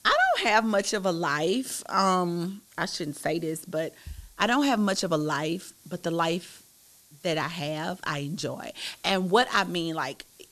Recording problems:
hiss; faint; throughout; 25 dB below the speech

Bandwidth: 13.5 kHz